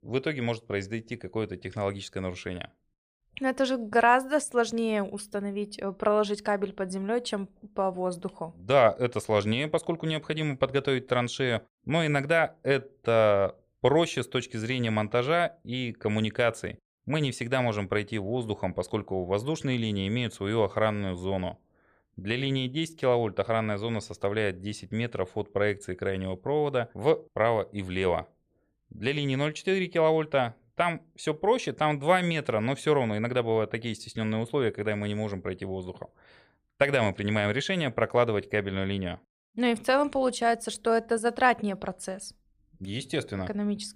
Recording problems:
none

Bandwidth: 15 kHz